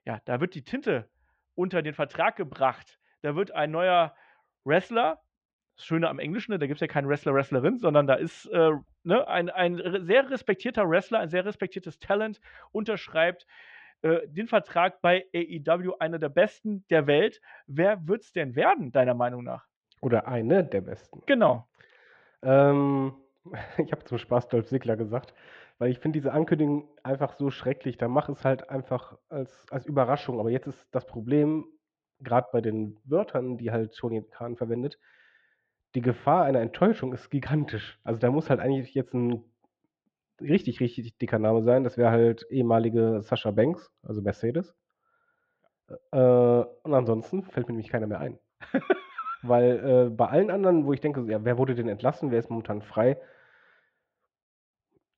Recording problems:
muffled; very; fading above 3.5 kHz

